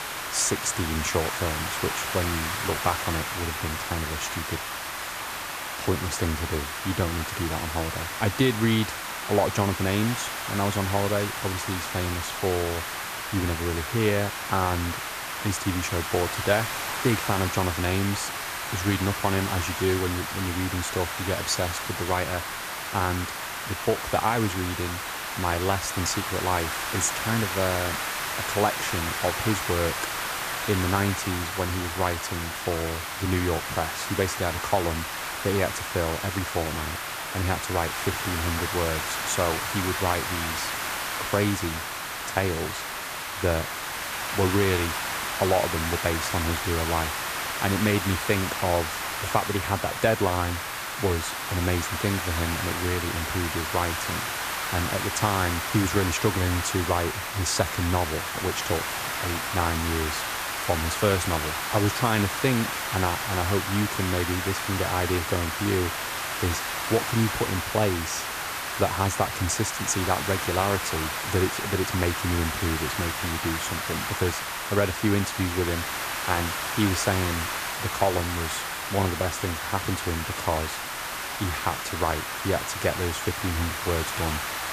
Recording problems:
hiss; loud; throughout; 2 dB below the speech

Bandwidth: 14.5 kHz